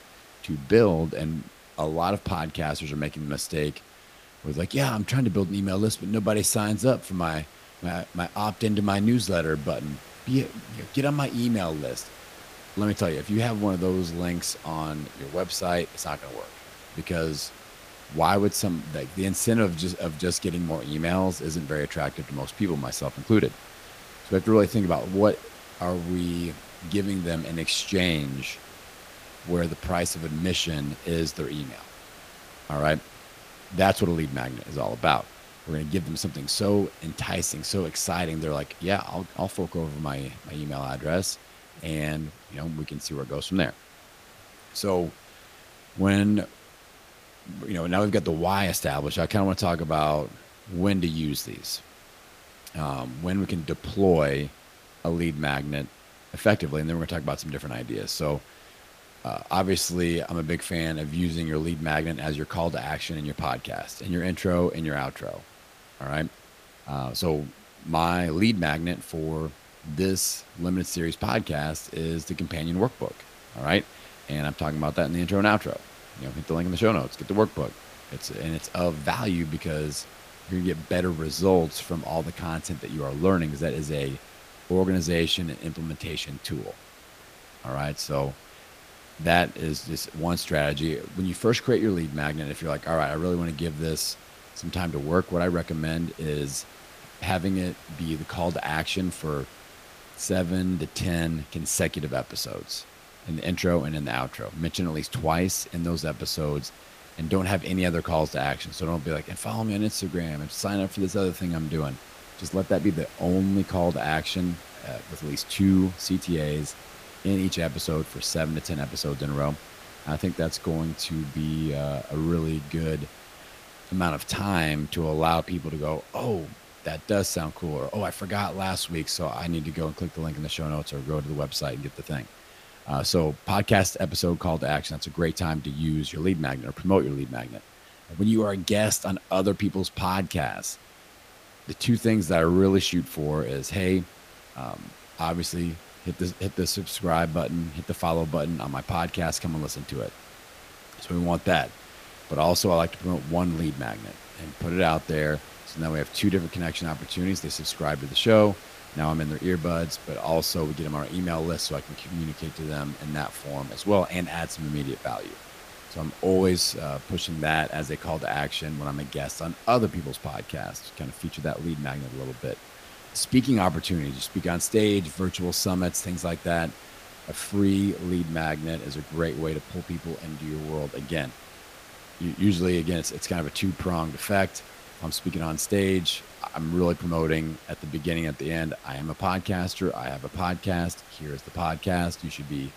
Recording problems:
hiss; noticeable; throughout; 20 dB below the speech

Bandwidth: 15 kHz